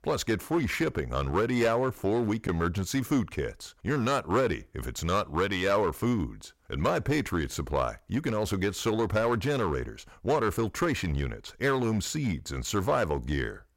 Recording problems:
distortion; slight; 5% of the sound clipped

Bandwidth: 16 kHz